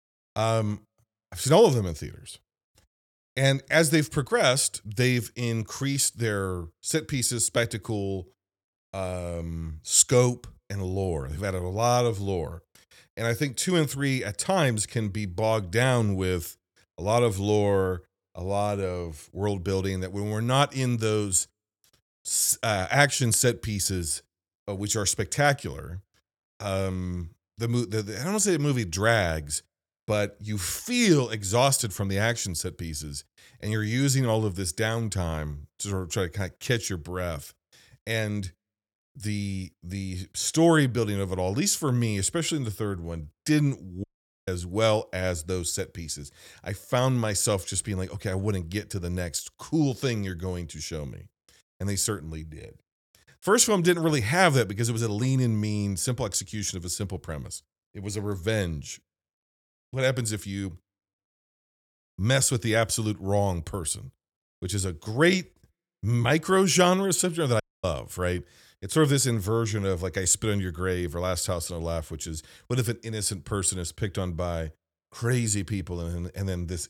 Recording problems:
audio cutting out; at 44 s and at 1:08

